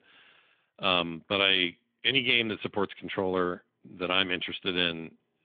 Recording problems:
phone-call audio; nothing above 3.5 kHz

